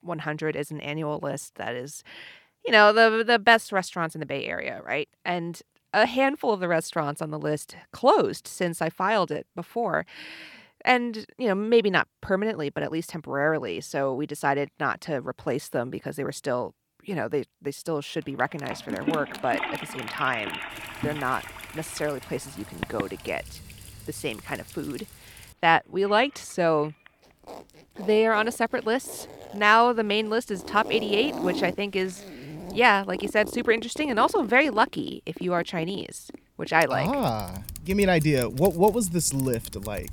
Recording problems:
household noises; noticeable; from 19 s on; 15 dB below the speech

